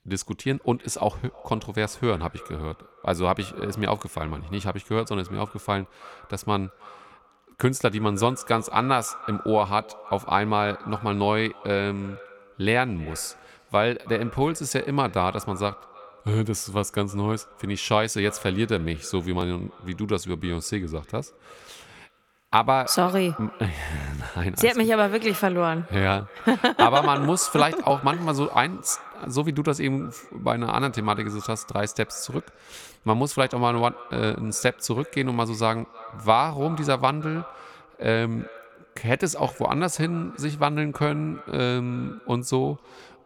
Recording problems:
echo of what is said; faint; throughout; 320 ms later, 20 dB below the speech

